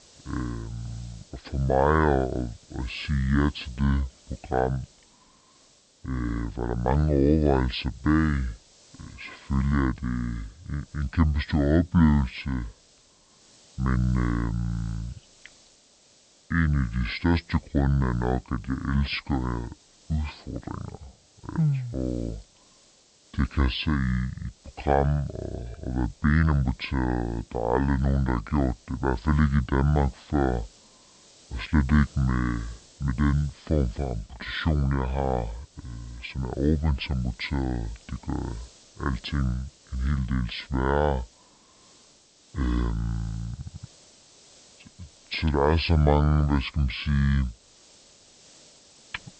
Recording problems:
wrong speed and pitch; too slow and too low; 0.6 times normal speed
high frequencies cut off; noticeable; nothing above 5 kHz
hiss; faint; throughout; 25 dB below the speech

